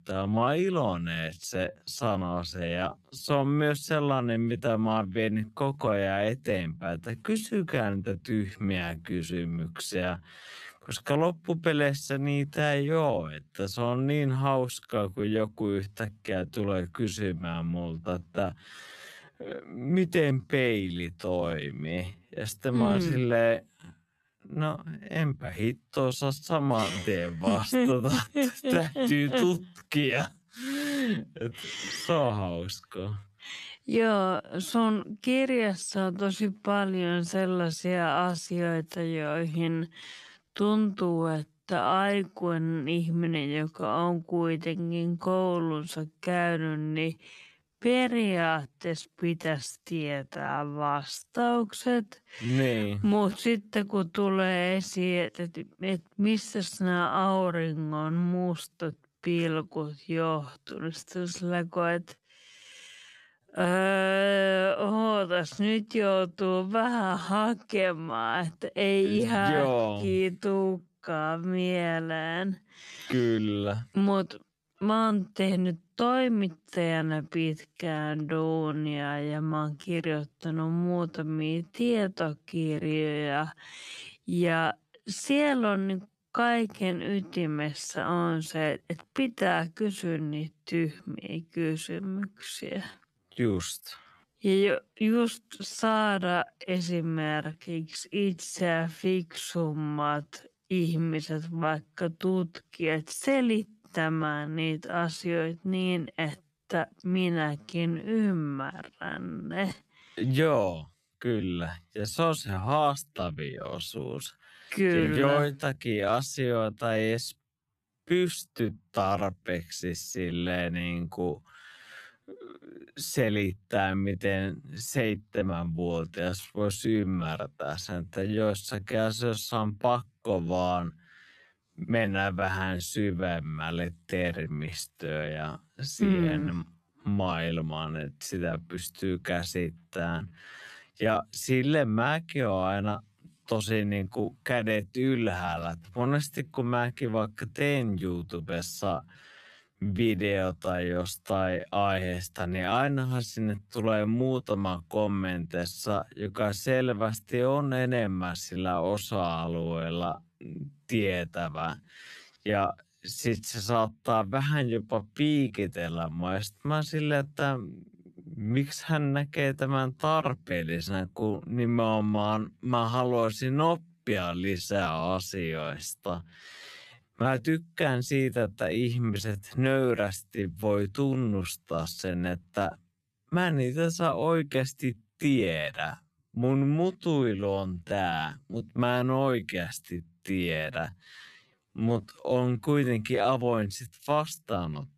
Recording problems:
wrong speed, natural pitch; too slow; 0.5 times normal speed

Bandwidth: 14 kHz